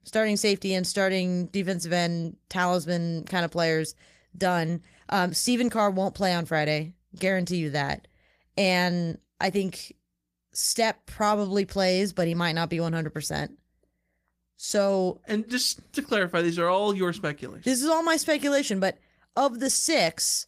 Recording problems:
garbled, watery; slightly

